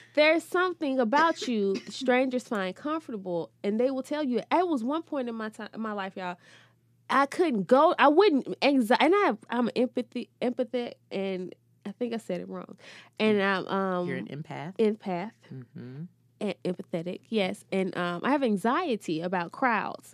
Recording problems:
none

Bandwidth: 14.5 kHz